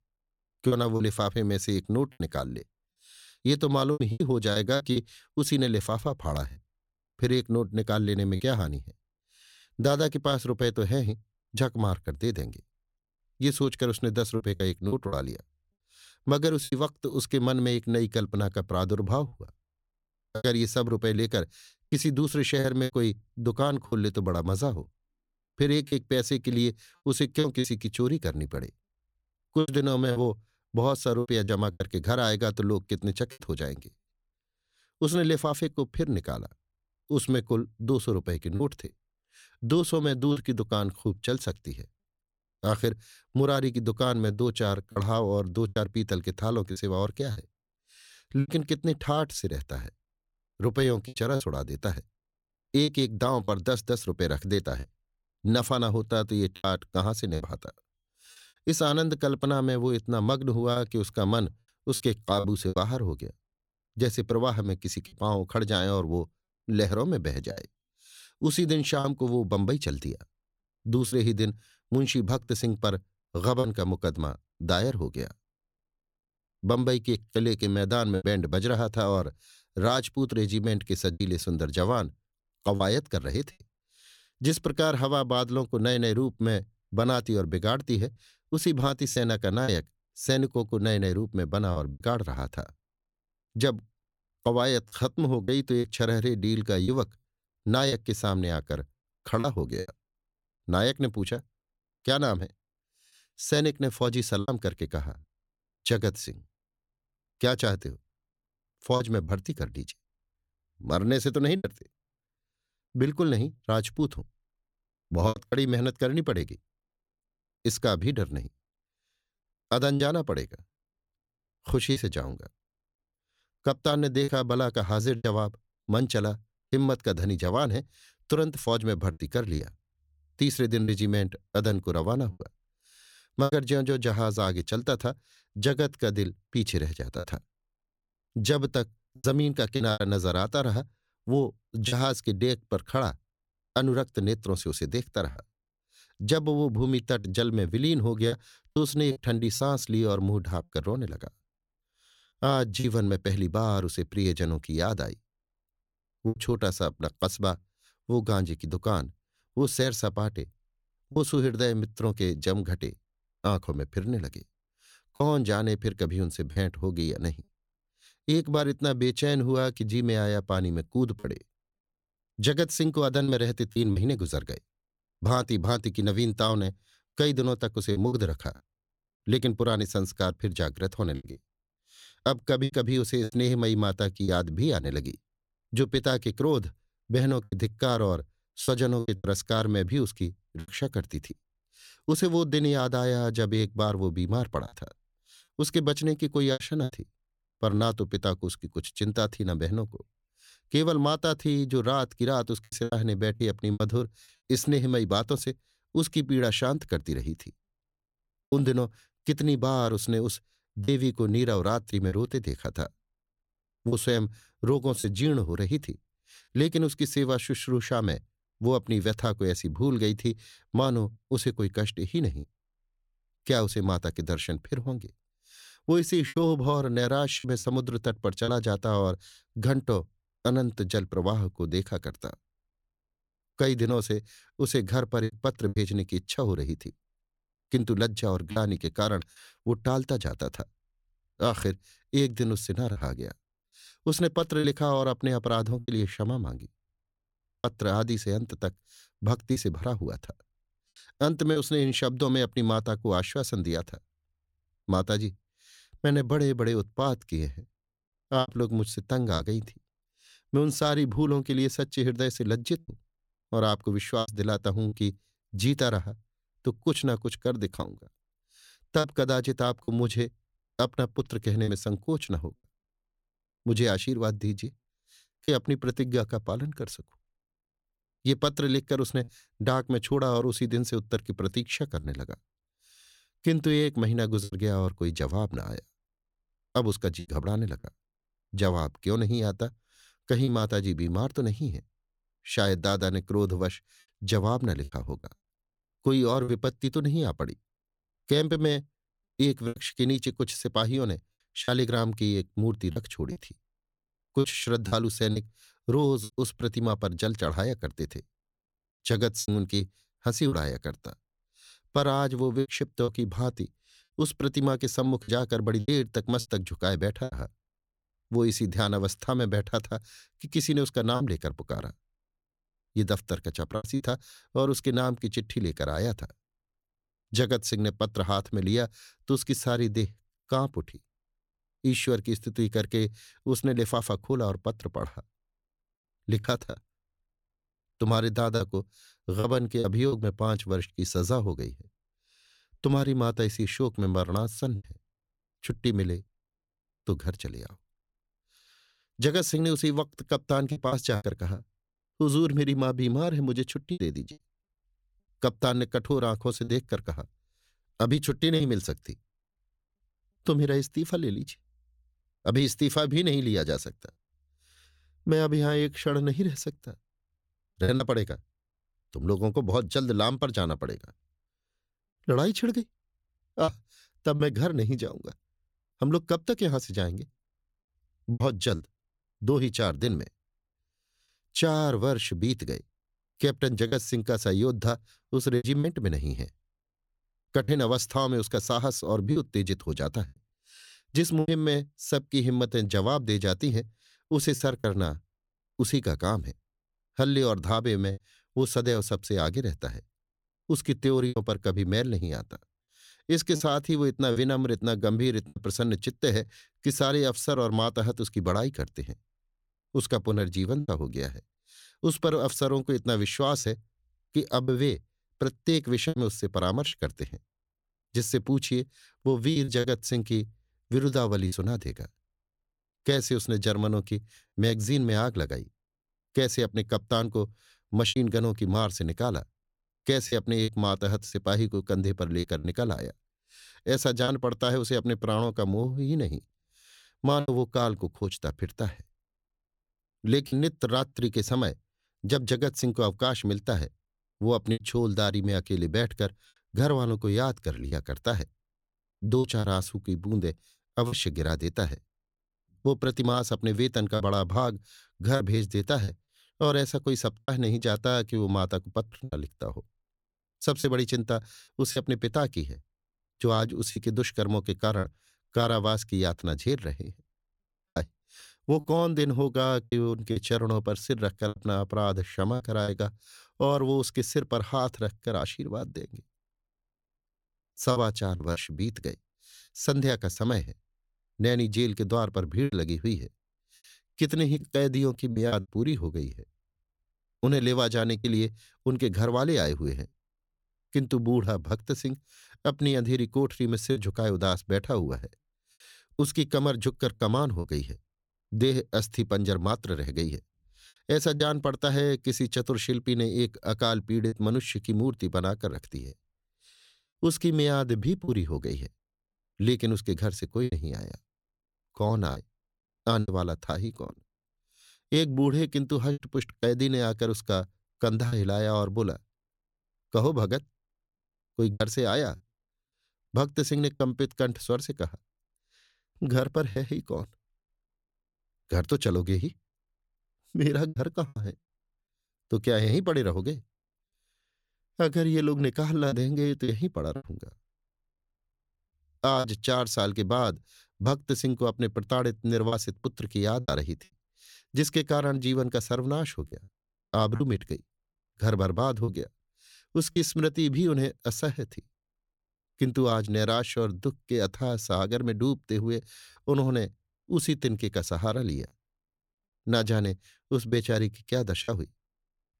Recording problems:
choppy; occasionally; 4% of the speech affected

